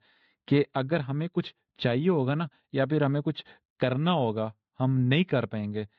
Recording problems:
muffled; slightly; fading above 4 kHz

